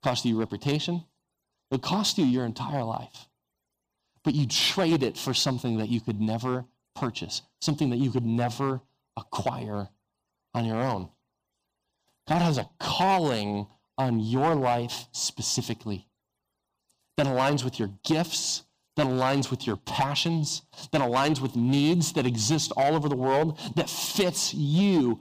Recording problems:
distortion; slight; 4% of the sound clipped

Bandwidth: 15 kHz